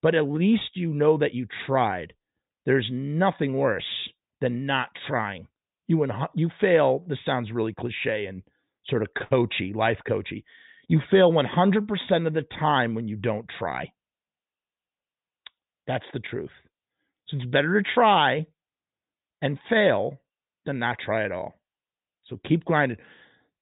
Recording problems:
high frequencies cut off; severe; nothing above 4 kHz

